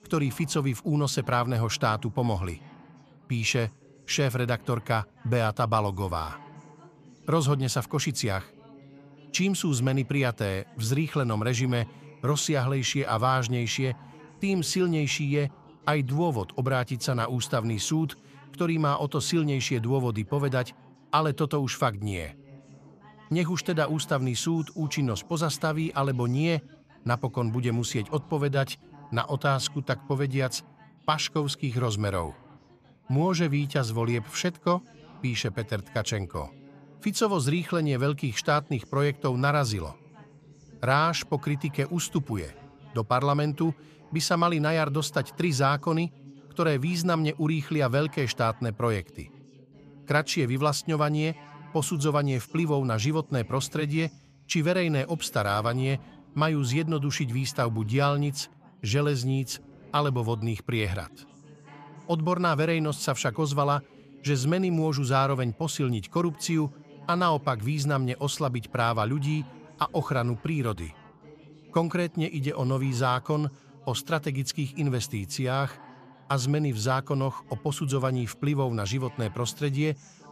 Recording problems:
background chatter; faint; throughout; 2 voices, 25 dB below the speech

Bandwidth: 14.5 kHz